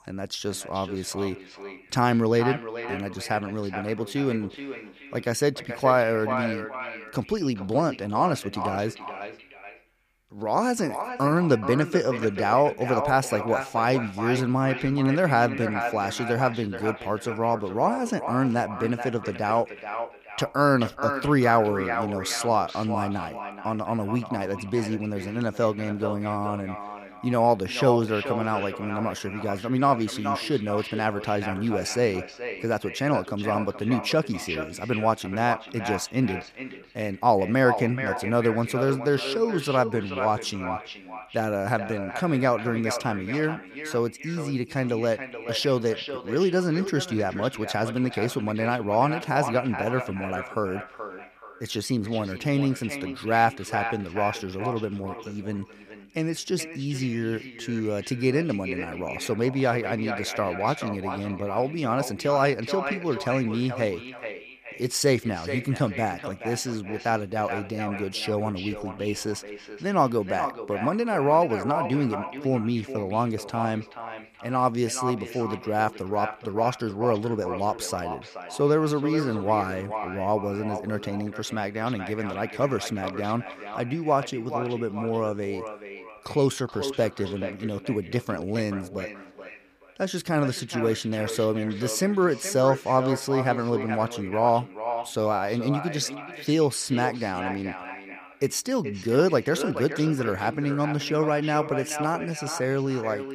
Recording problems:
echo of what is said; strong; throughout; 430 ms later, 9 dB below the speech

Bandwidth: 15 kHz